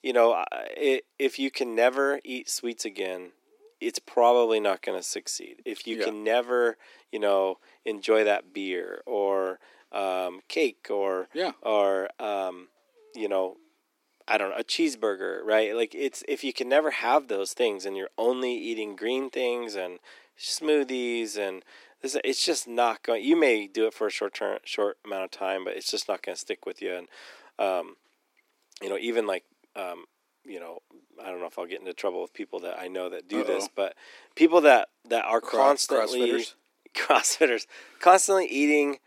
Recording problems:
thin; somewhat; fading below 300 Hz

